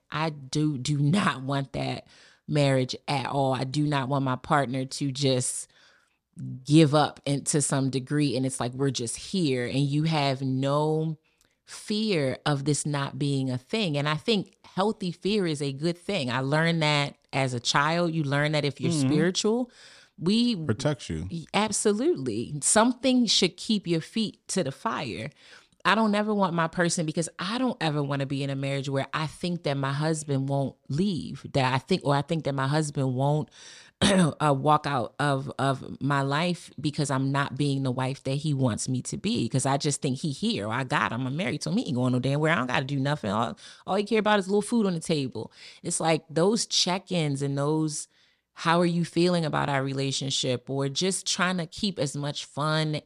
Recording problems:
none

